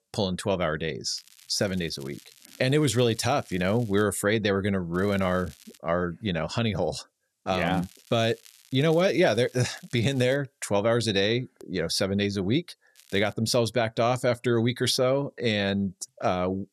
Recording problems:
crackling; faint; 4 times, first at 1 s; 25 dB below the speech

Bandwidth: 13.5 kHz